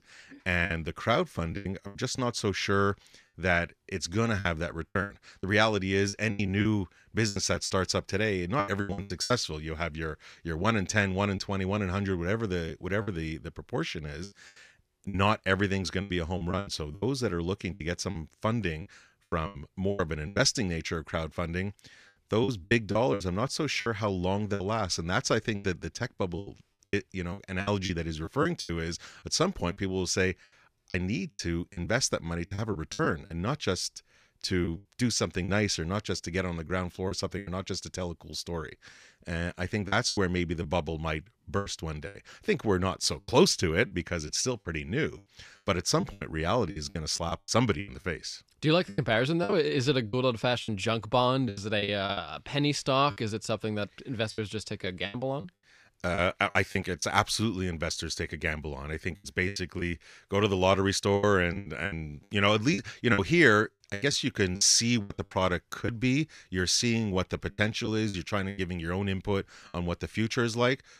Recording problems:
choppy; very; 10% of the speech affected

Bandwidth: 14.5 kHz